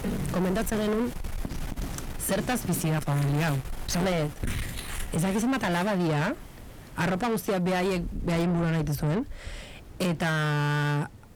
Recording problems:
distortion; heavy; 6 dB below the speech
household noises; noticeable; until 6 s; 10 dB below the speech
wind in the background; noticeable; throughout; 15 dB below the speech

